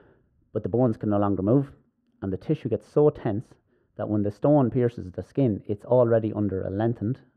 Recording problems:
muffled; very; fading above 2.5 kHz

